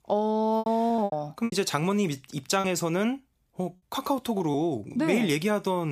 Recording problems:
choppy; very; at 0.5 s and at 2.5 s; 13% of the speech affected
abrupt cut into speech; at the end

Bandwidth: 15 kHz